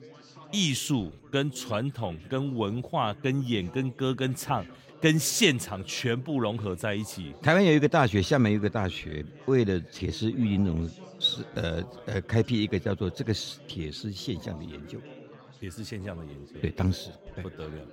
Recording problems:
chatter from many people; faint; throughout; 20 dB below the speech

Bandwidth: 16 kHz